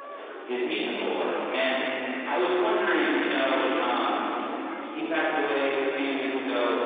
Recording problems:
distortion; heavy; 10 dB below the speech
room echo; strong; dies away in 3 s
off-mic speech; far
phone-call audio; nothing above 3.5 kHz
murmuring crowd; noticeable; throughout; 10 dB below the speech
household noises; very faint; from 3 s on; 15 dB below the speech

